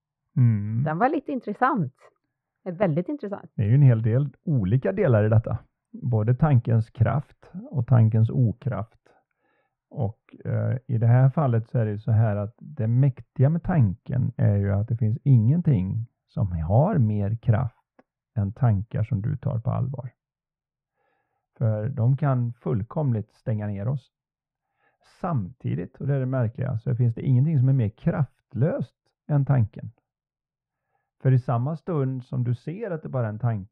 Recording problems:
muffled; very; fading above 1 kHz

